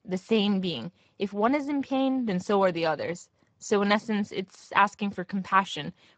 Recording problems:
garbled, watery; badly; nothing above 7.5 kHz

